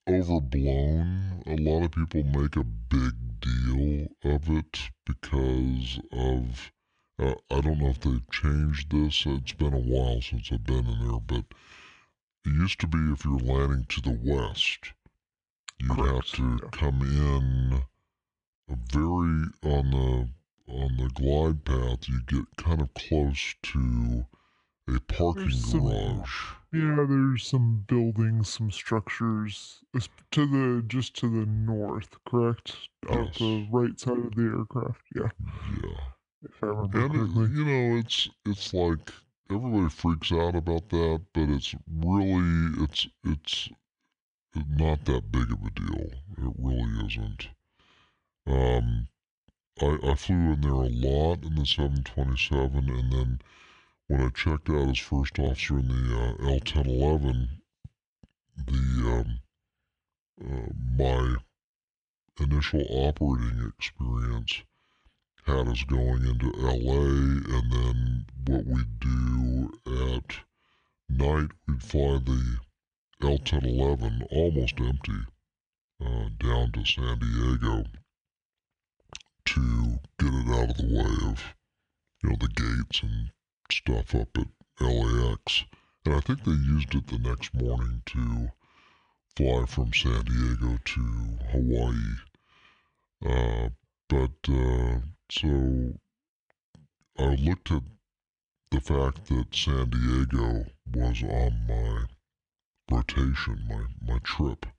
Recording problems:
wrong speed and pitch; too slow and too low; 0.7 times normal speed

